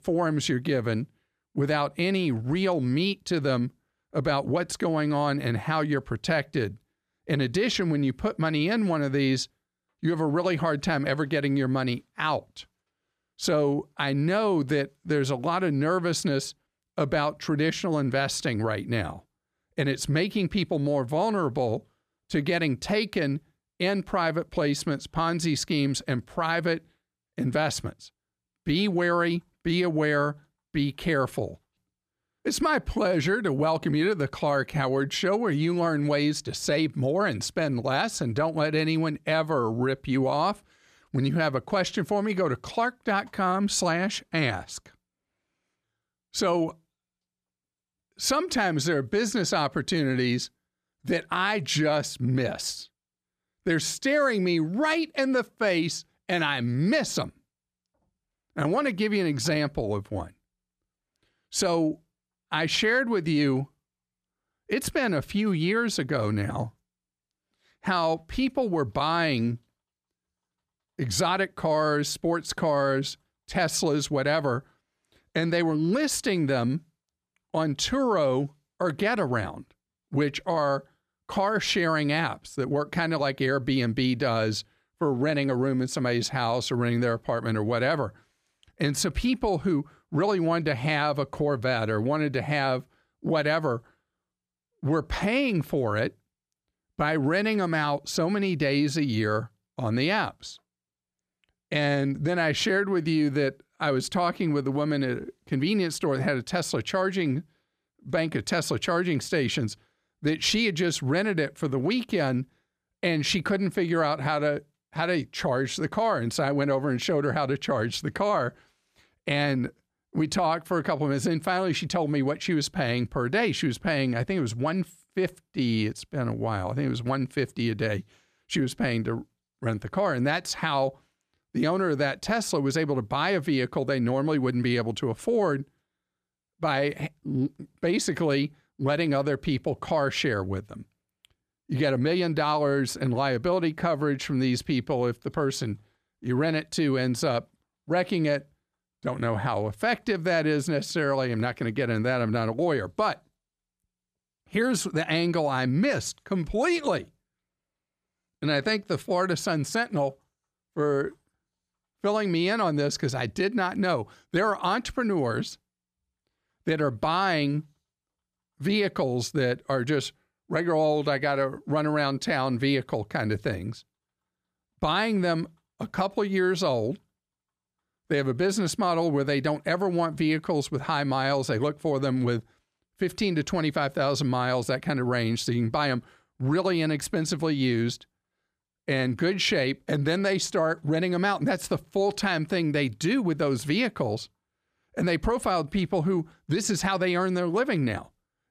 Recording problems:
none

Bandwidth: 14.5 kHz